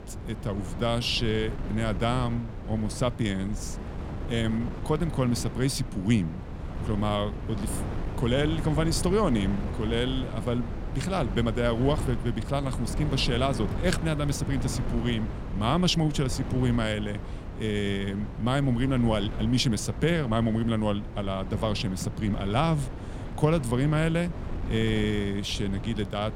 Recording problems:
wind noise on the microphone; occasional gusts; 10 dB below the speech

